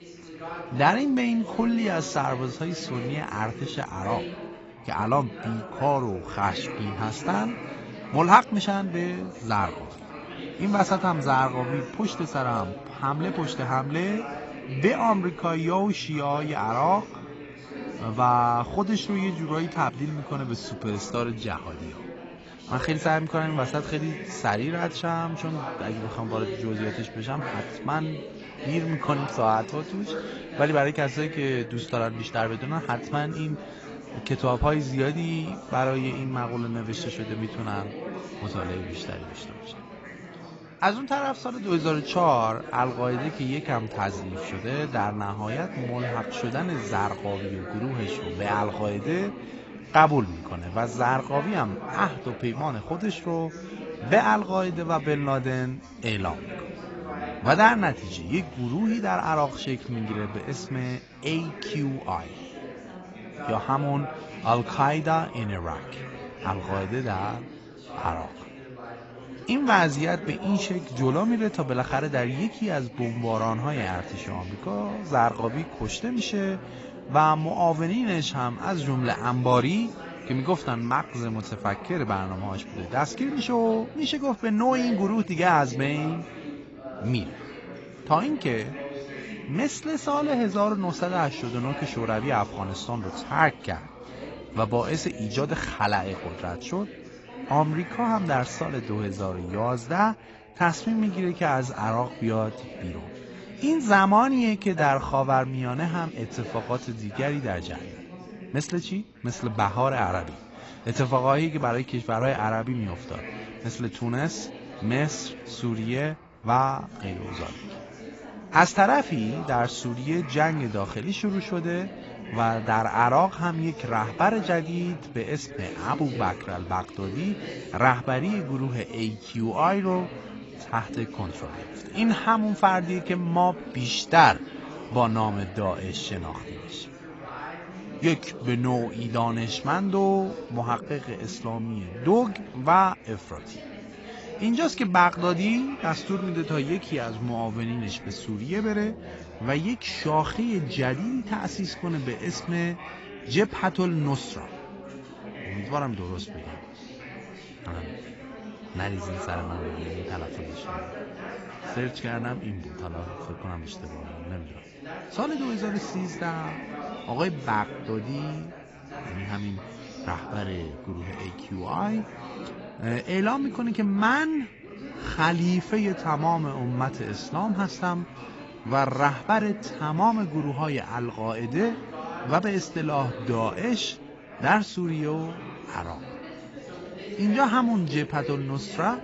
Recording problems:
garbled, watery; badly; nothing above 7.5 kHz
background chatter; noticeable; throughout; 4 voices, 15 dB below the speech

